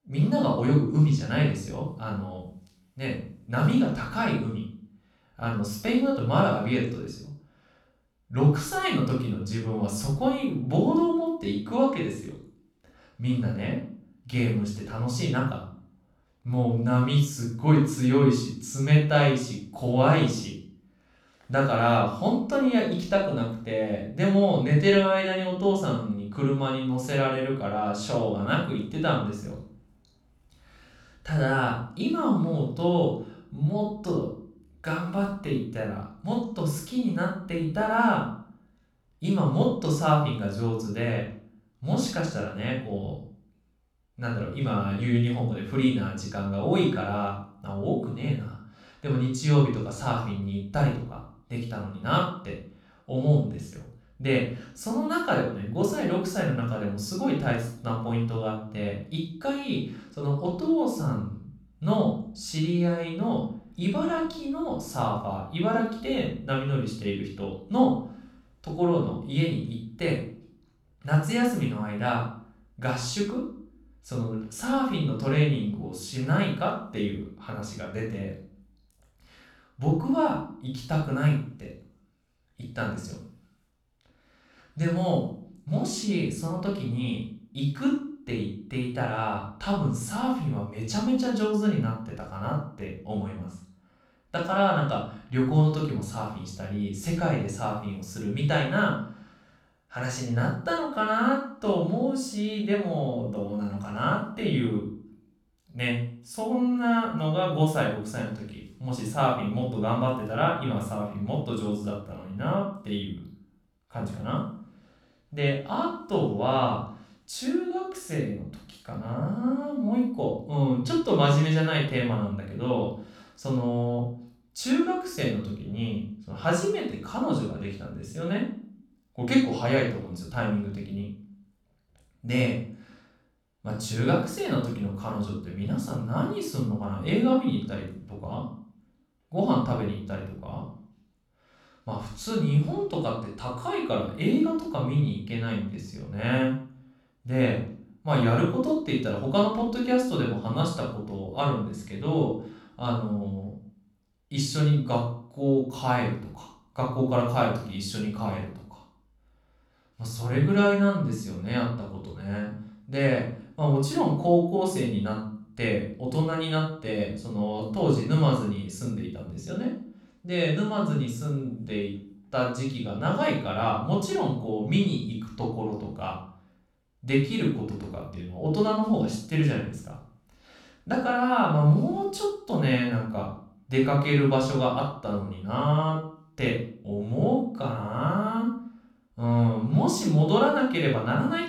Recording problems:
off-mic speech; far
room echo; noticeable; dies away in 0.5 s

